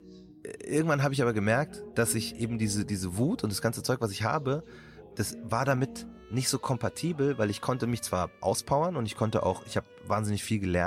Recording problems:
background music; noticeable; throughout; 20 dB below the speech
voice in the background; faint; throughout; 30 dB below the speech
abrupt cut into speech; at the end

